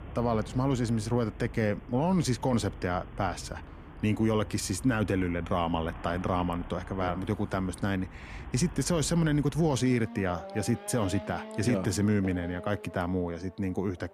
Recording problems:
traffic noise; noticeable; throughout; 15 dB below the speech

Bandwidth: 14 kHz